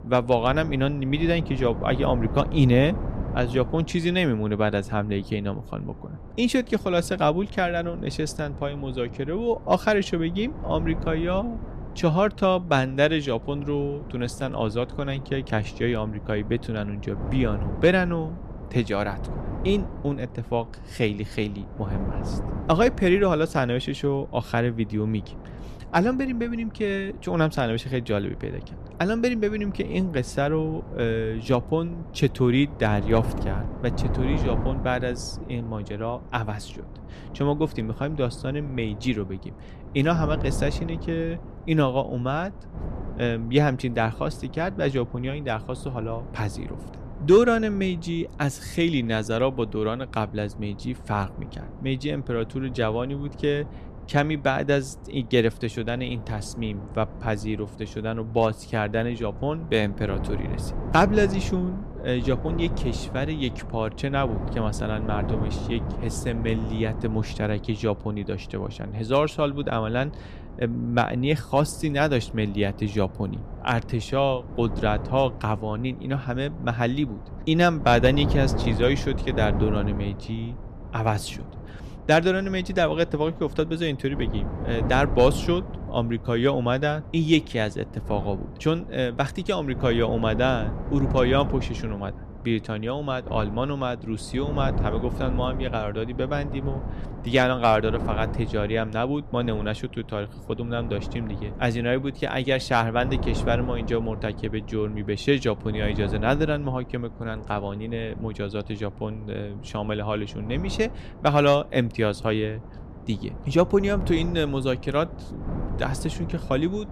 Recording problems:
wind noise on the microphone; occasional gusts; 15 dB below the speech

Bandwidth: 14.5 kHz